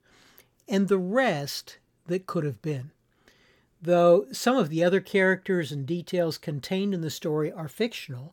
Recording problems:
none

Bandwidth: 18 kHz